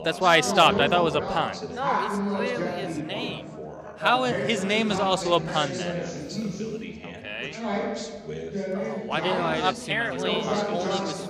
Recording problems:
background chatter; loud; throughout; 3 voices, 5 dB below the speech

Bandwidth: 14.5 kHz